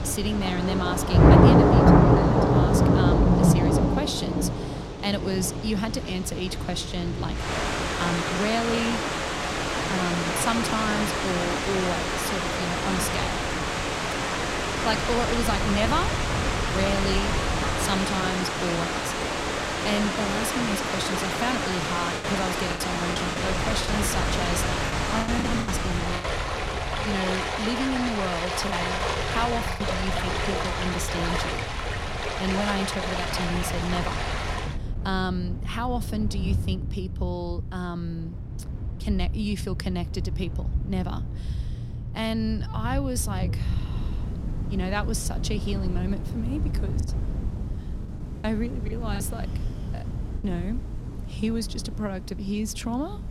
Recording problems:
rain or running water; very loud; throughout; 4 dB above the speech
wind noise on the microphone; occasional gusts; 15 dB below the speech
choppy; very; from 22 to 26 s, from 29 to 31 s and from 47 to 50 s; 12% of the speech affected

